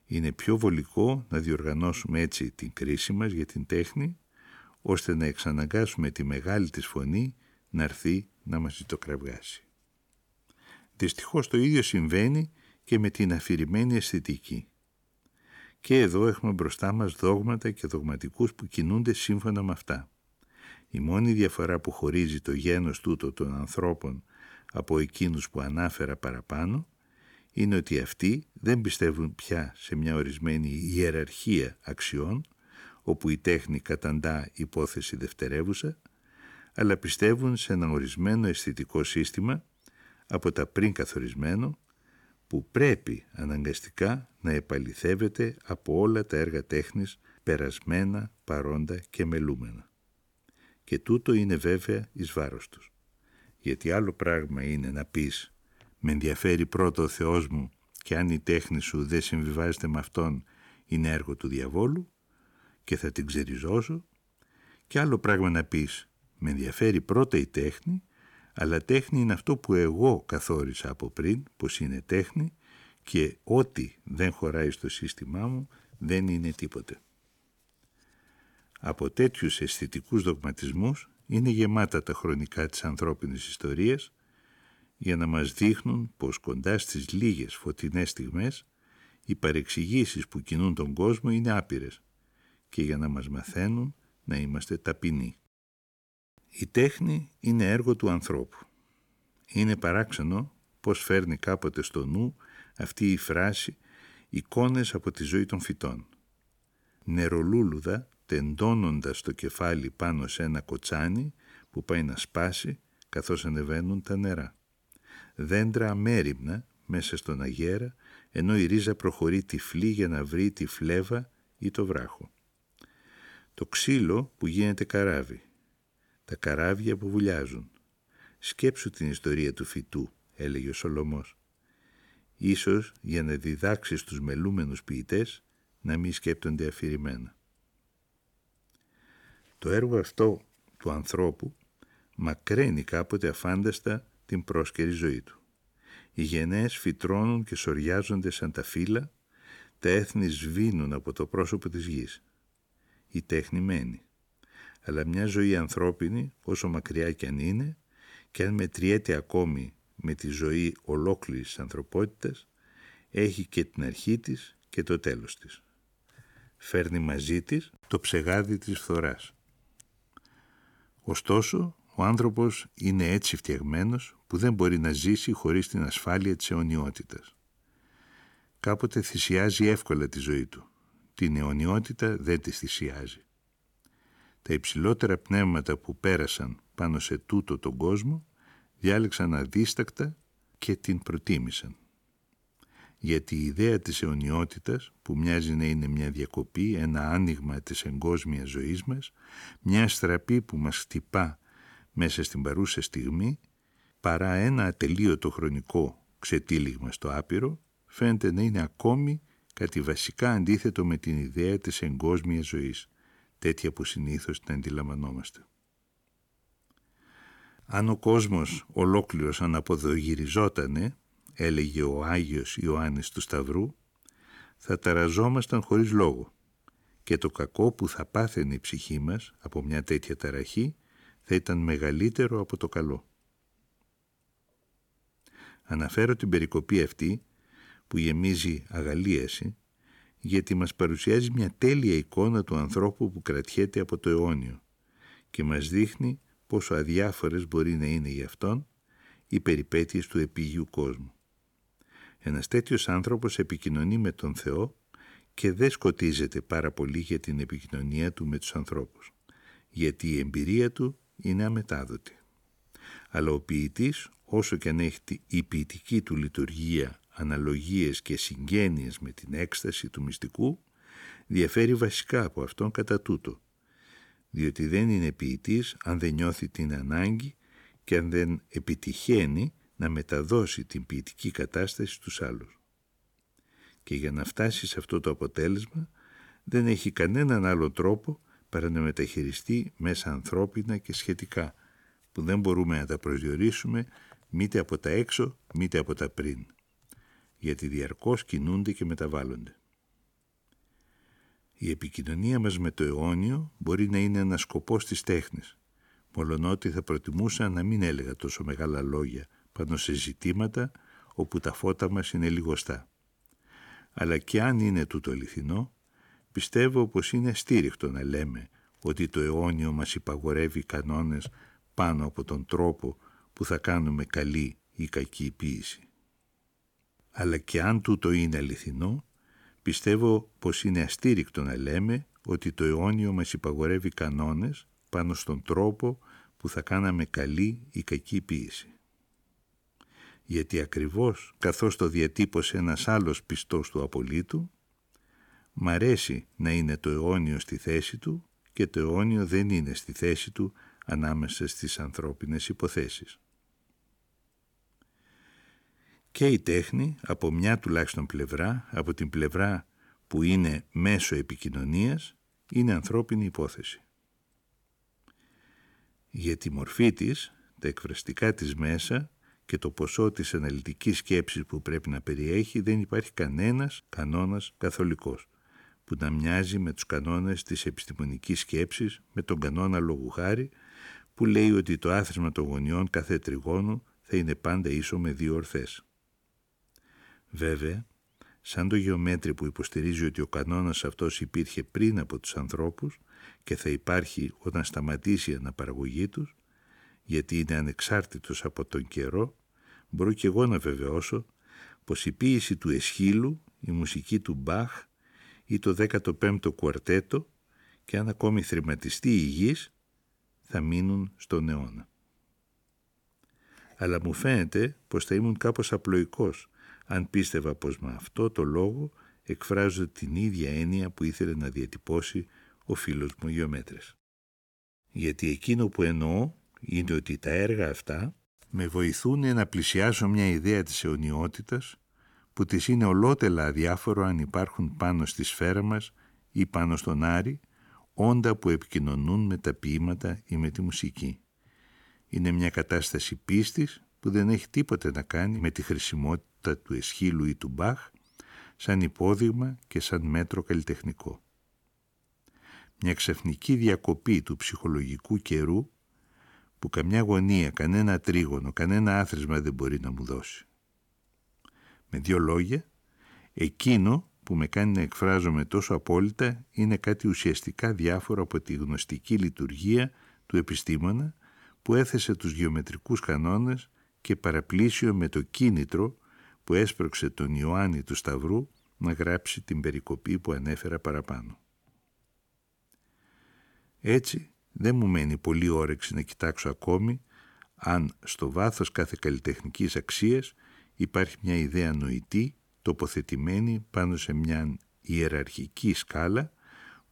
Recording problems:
none

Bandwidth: 18.5 kHz